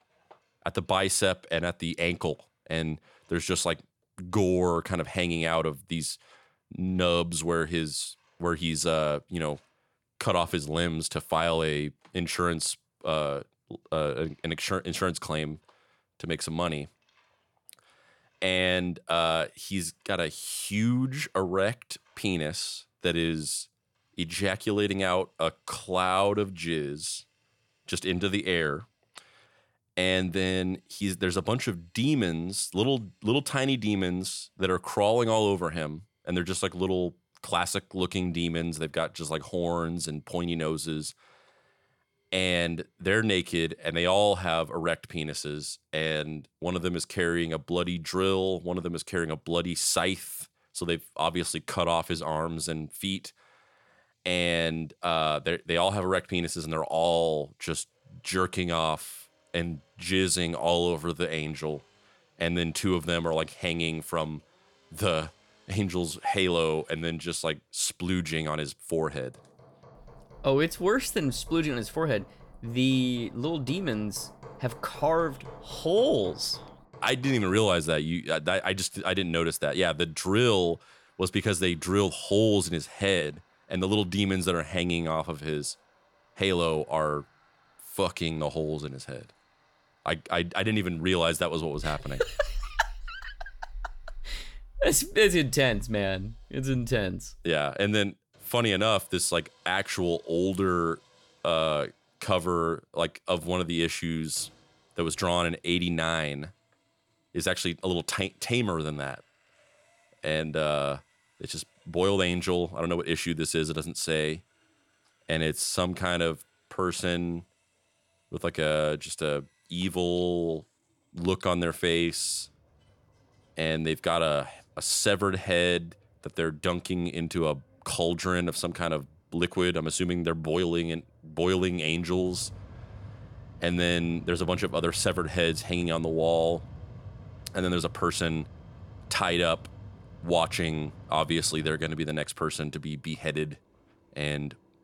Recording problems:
machinery noise; faint; throughout; 25 dB below the speech

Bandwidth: 18 kHz